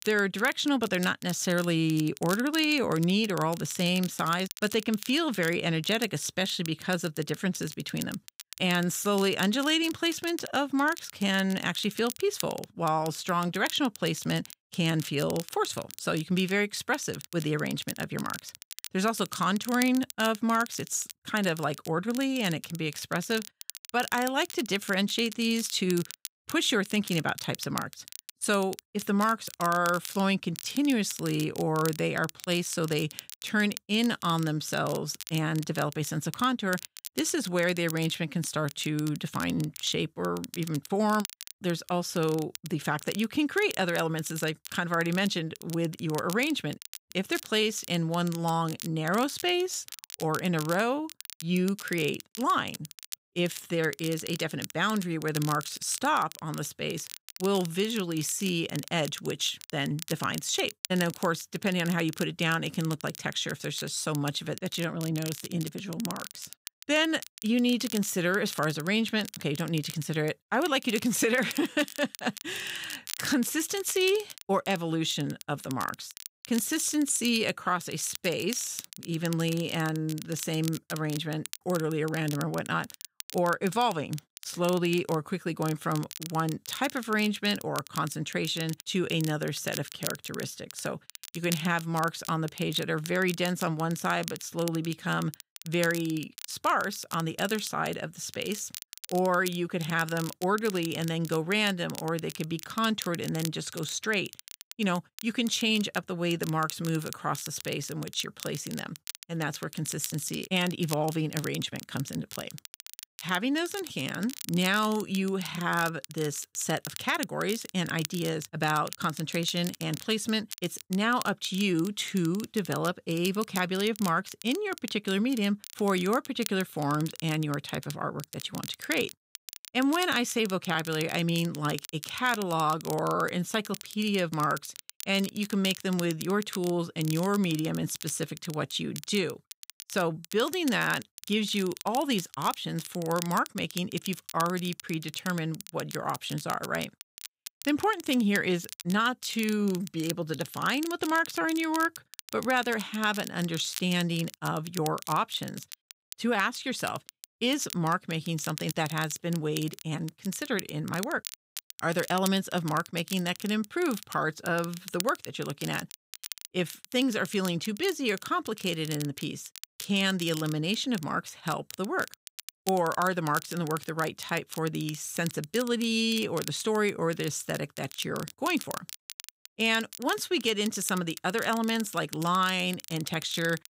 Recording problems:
crackle, like an old record; noticeable; 15 dB below the speech

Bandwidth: 15.5 kHz